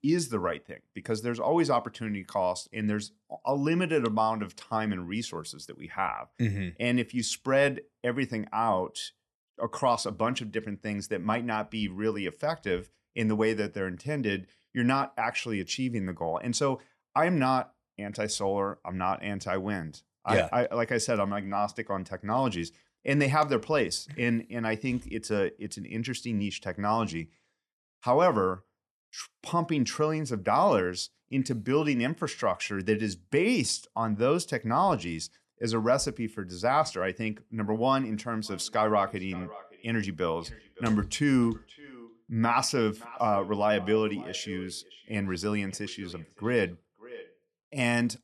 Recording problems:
echo of what is said; faint; from 38 s on; 570 ms later, 20 dB below the speech

